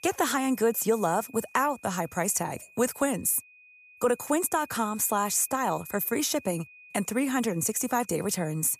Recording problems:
high-pitched whine; faint; throughout; 2.5 kHz, 25 dB below the speech

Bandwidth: 14.5 kHz